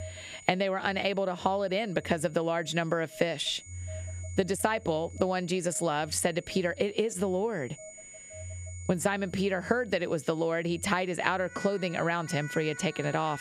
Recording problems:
squashed, flat; somewhat, background pumping
alarms or sirens; noticeable; throughout; 15 dB below the speech
high-pitched whine; faint; throughout; 7 kHz, 20 dB below the speech

